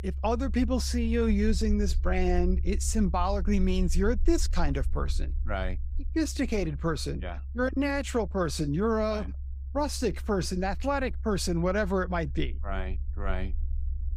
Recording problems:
low rumble; faint; throughout; 25 dB below the speech

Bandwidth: 15.5 kHz